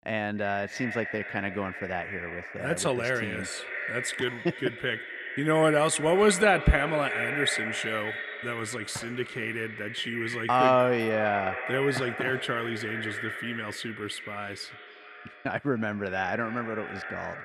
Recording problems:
echo of what is said; strong; throughout; 300 ms later, 7 dB below the speech

